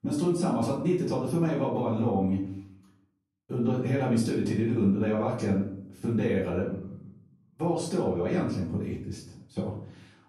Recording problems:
off-mic speech; far
room echo; noticeable; dies away in 0.5 s

